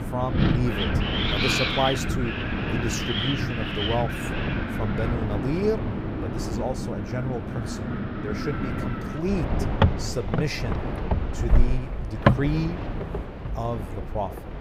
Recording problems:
wind in the background; very loud; throughout; 3 dB above the speech

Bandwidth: 15.5 kHz